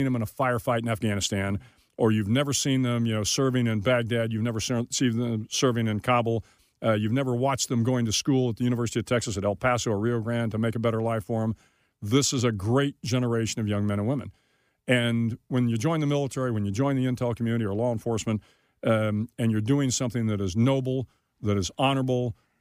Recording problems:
abrupt cut into speech; at the start

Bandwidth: 15 kHz